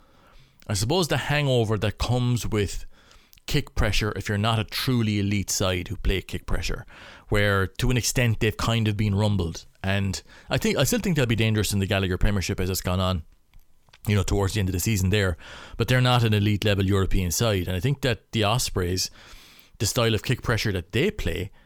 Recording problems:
none

